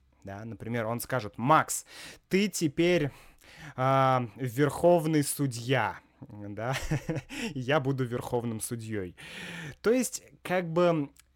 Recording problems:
none

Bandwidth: 17 kHz